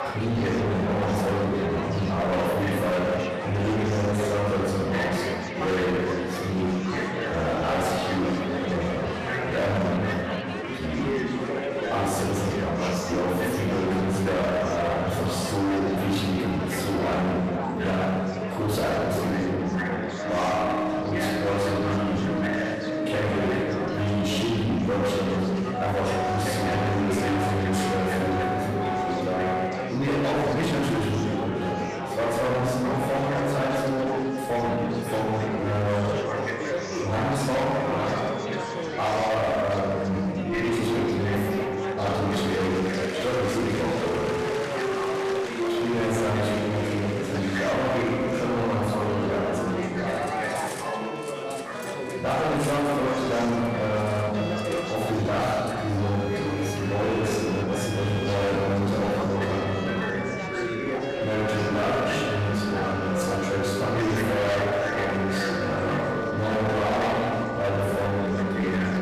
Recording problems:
distortion; heavy; 28% of the sound clipped
room echo; strong; dies away in 1.6 s
off-mic speech; far
background music; loud; from 19 s on; 7 dB below the speech
chatter from many people; loud; throughout; 5 dB below the speech
clattering dishes; faint; from 50 to 56 s; peak 10 dB below the speech

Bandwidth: 14.5 kHz